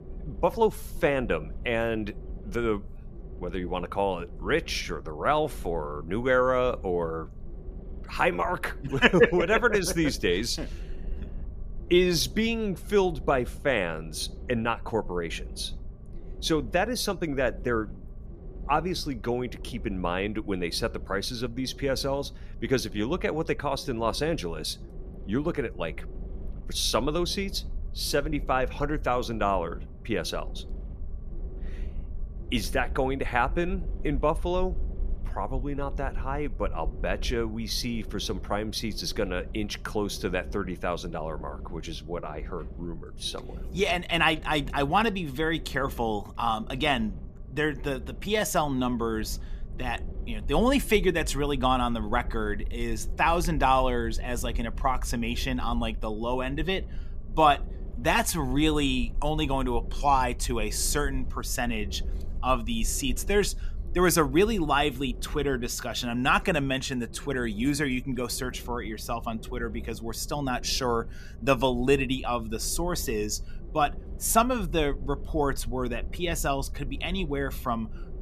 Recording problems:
low rumble; faint; throughout; 25 dB below the speech

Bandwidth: 14.5 kHz